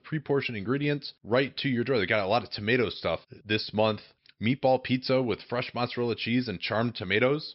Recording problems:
high frequencies cut off; noticeable; nothing above 5.5 kHz

